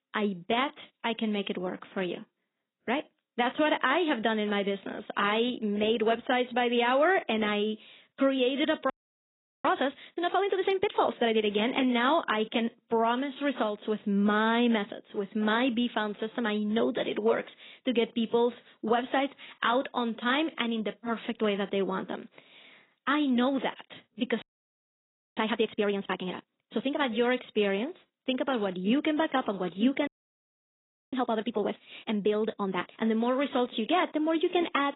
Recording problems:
garbled, watery; badly; nothing above 4 kHz
audio freezing; at 9 s for 0.5 s, at 24 s for 1 s and at 30 s for 1 s

